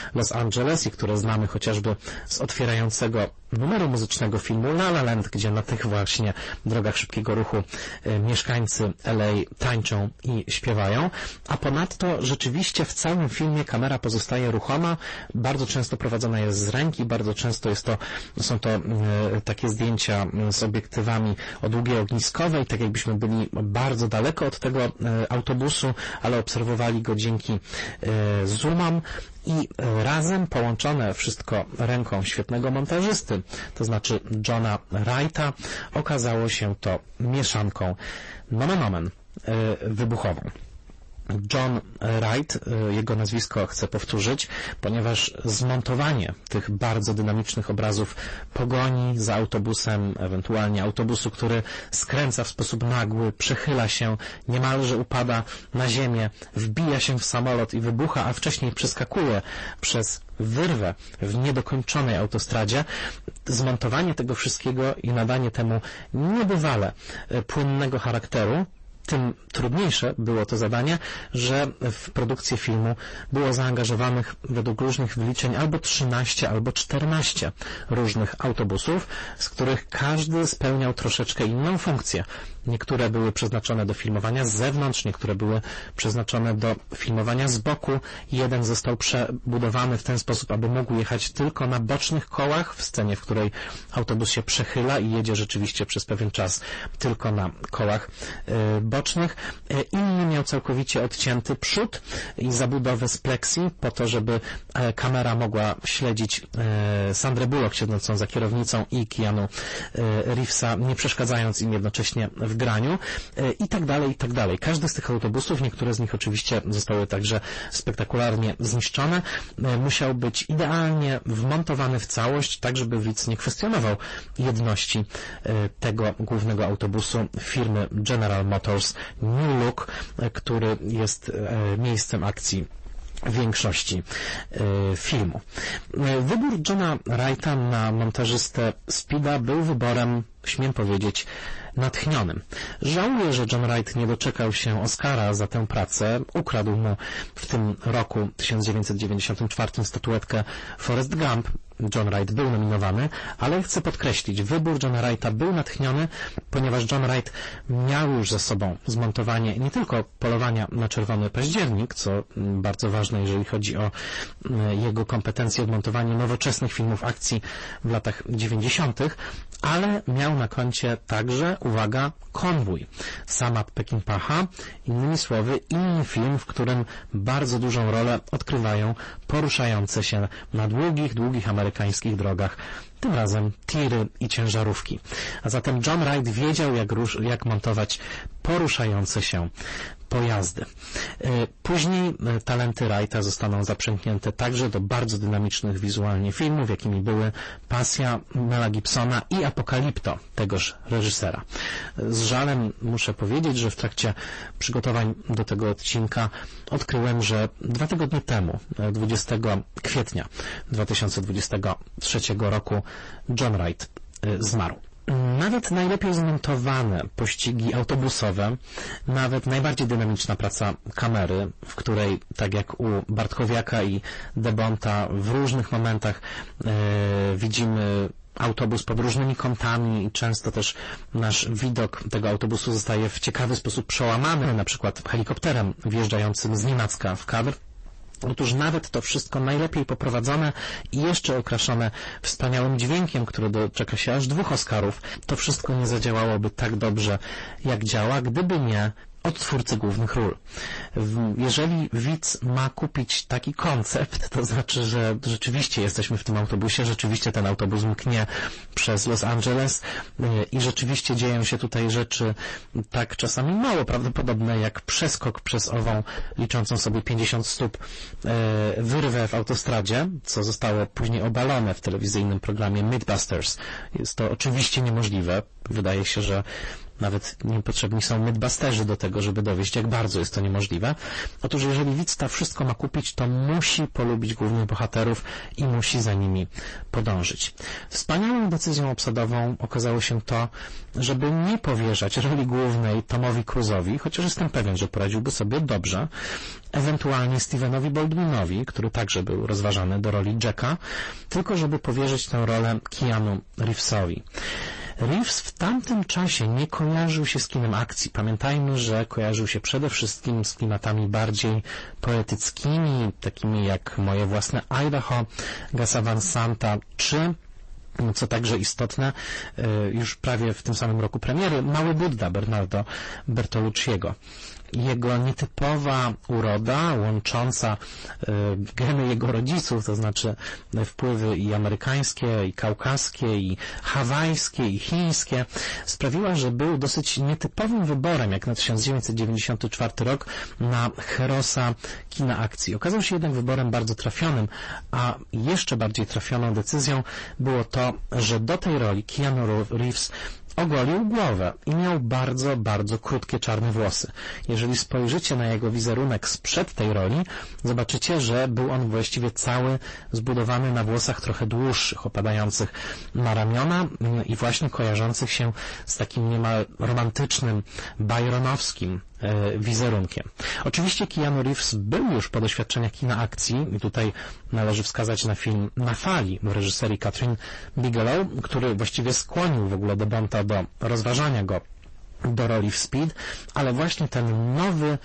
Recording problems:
distortion; heavy; 22% of the sound clipped
garbled, watery; slightly; nothing above 8 kHz
squashed, flat; somewhat

